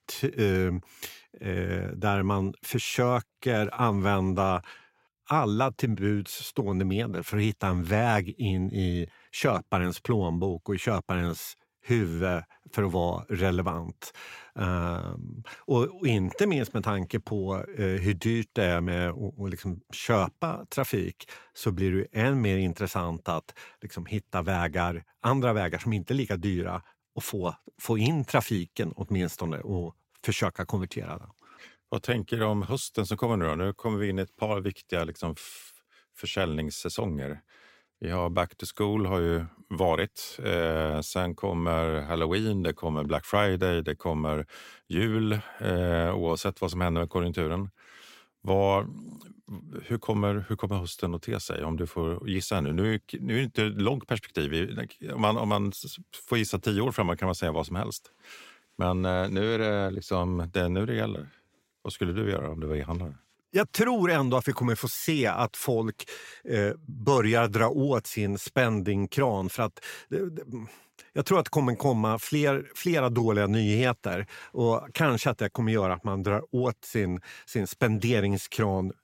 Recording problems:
none

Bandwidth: 16 kHz